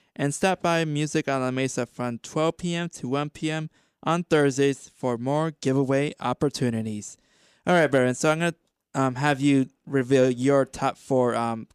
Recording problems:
none

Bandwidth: 15 kHz